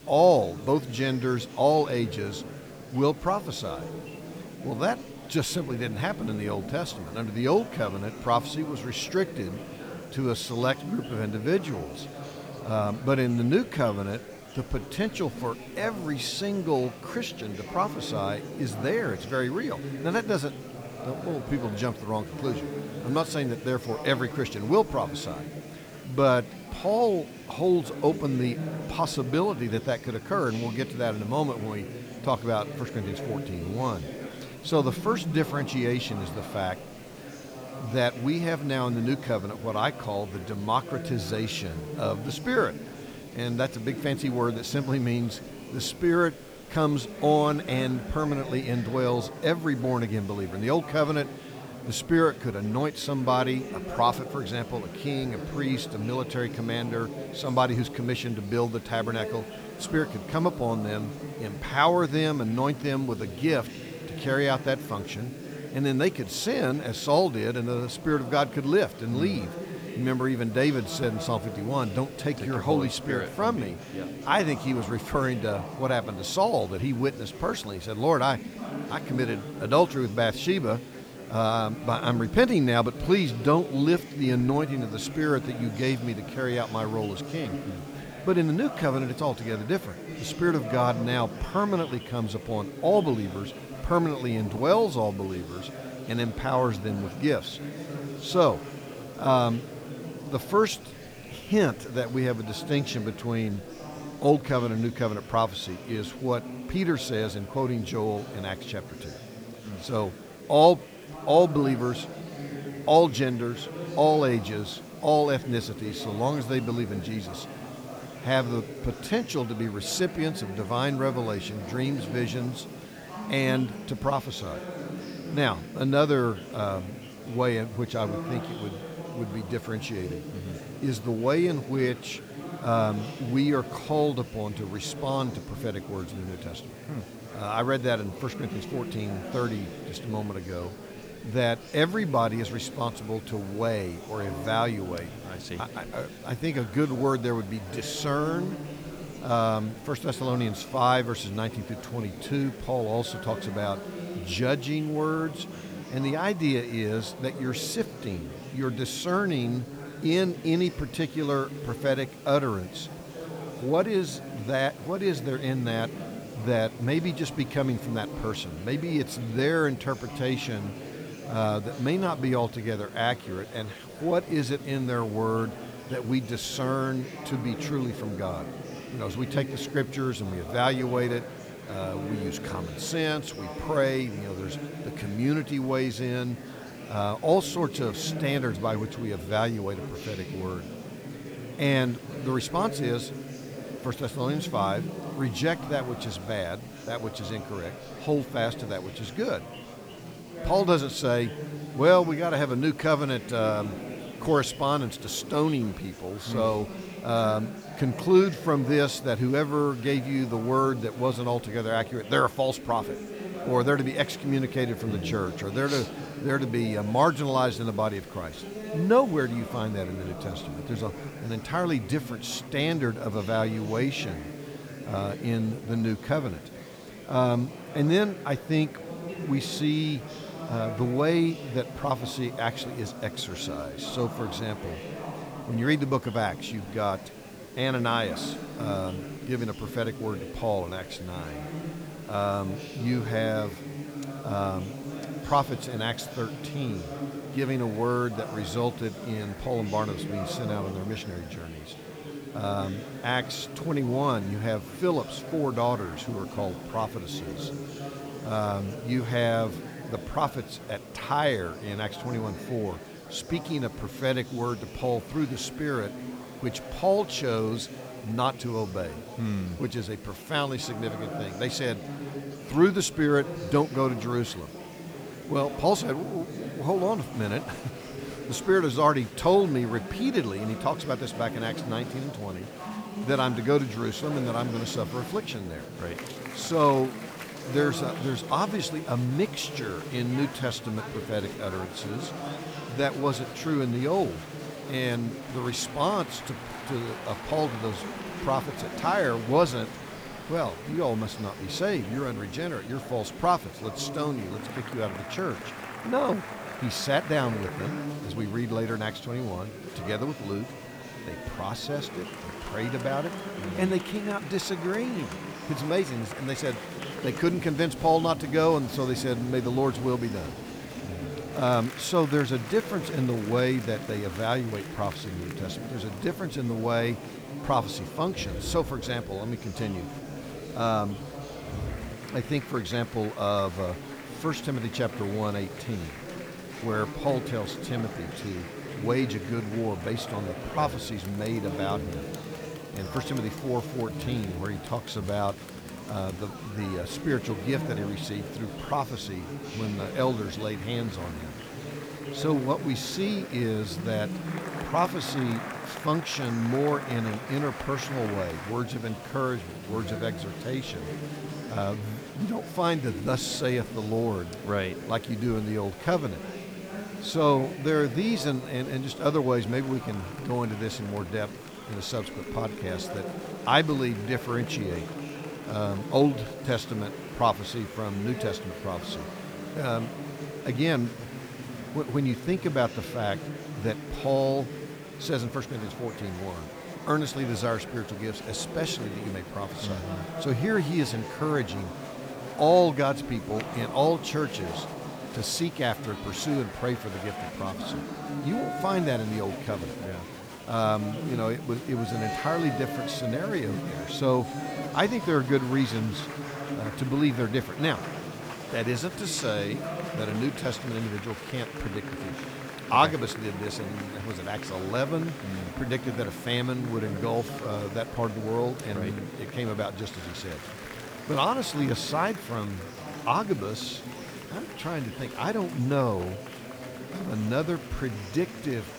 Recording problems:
murmuring crowd; noticeable; throughout; 10 dB below the speech
hiss; faint; throughout; 25 dB below the speech

